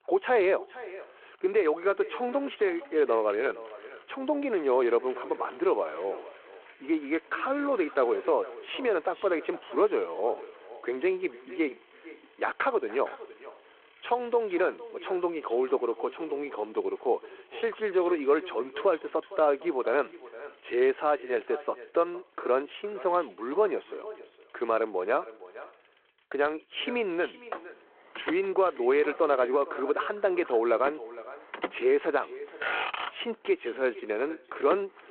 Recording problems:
echo of what is said; noticeable; throughout; 460 ms later, 15 dB below the speech
phone-call audio
traffic noise; noticeable; throughout; 15 dB below the speech

